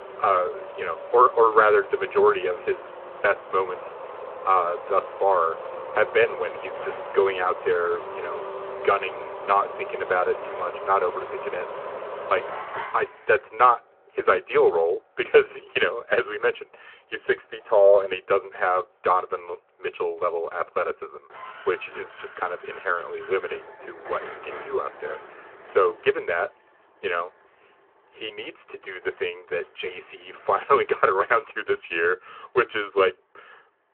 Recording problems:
phone-call audio
traffic noise; noticeable; throughout; 10 dB below the speech

